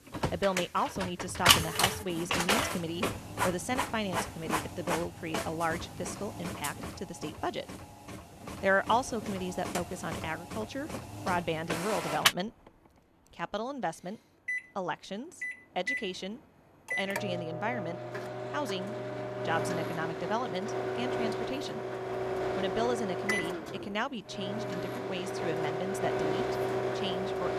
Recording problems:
household noises; very loud; throughout; 2 dB above the speech

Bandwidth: 14.5 kHz